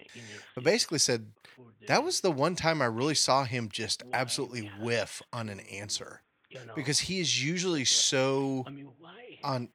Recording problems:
voice in the background; faint; throughout; 20 dB below the speech

